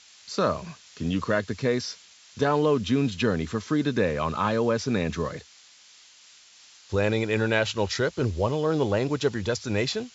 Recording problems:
high frequencies cut off; noticeable; nothing above 8 kHz
hiss; faint; throughout; 25 dB below the speech

